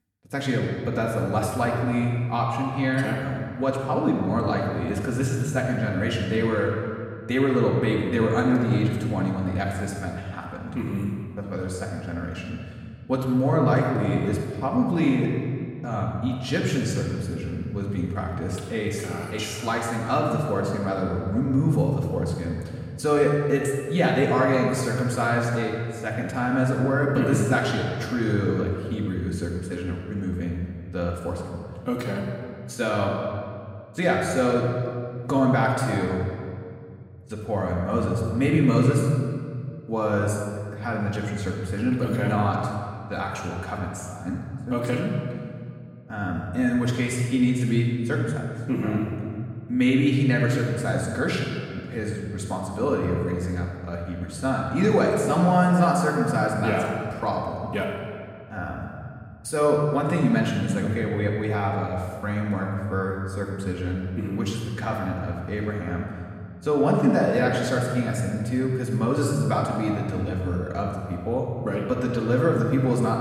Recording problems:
off-mic speech; far
room echo; noticeable; dies away in 1.9 s

